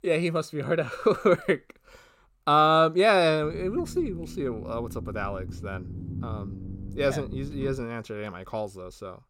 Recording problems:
low rumble; faint; from 3.5 to 8 s; 25 dB below the speech

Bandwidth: 16 kHz